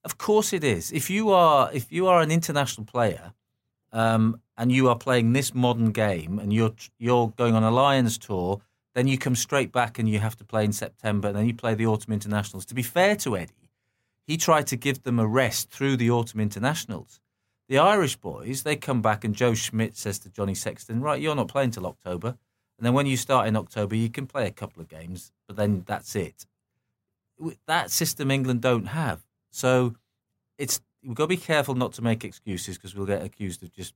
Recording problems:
none

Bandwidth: 16 kHz